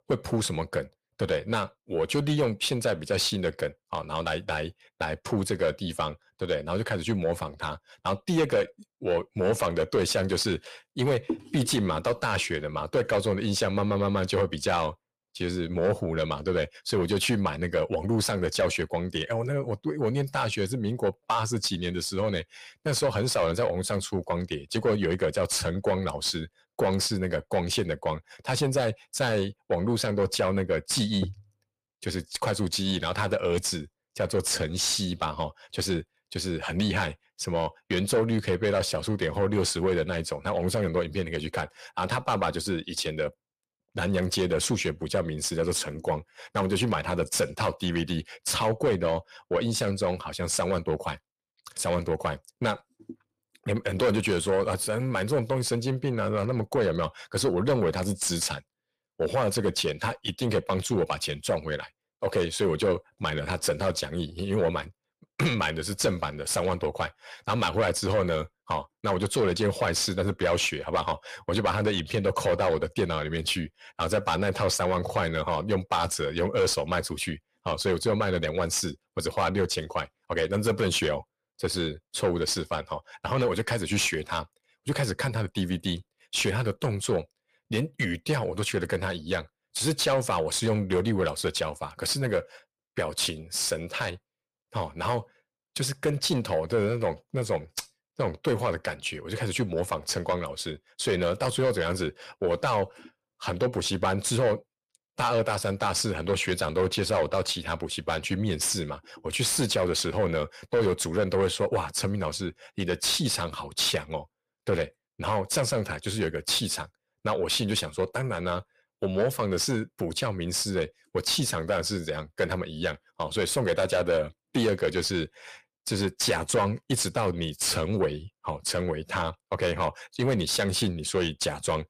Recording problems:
distortion; slight; 10 dB below the speech

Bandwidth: 15 kHz